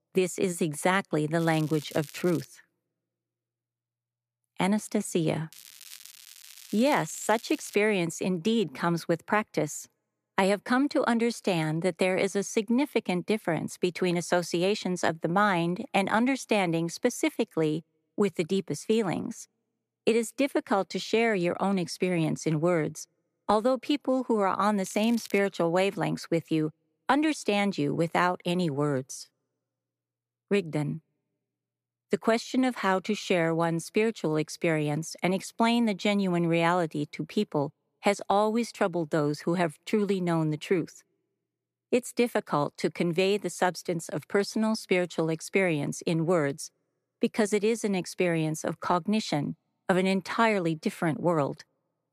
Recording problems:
crackling; noticeable; from 1.5 to 2.5 s, from 5.5 to 8 s and at 25 s; 20 dB below the speech

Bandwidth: 14.5 kHz